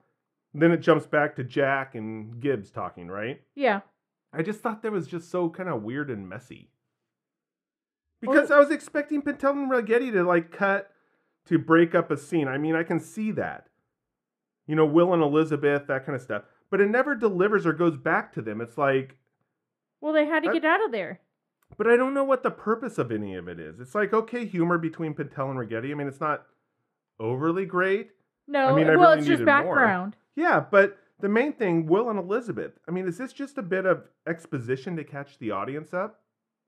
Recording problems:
muffled; very; fading above 2.5 kHz

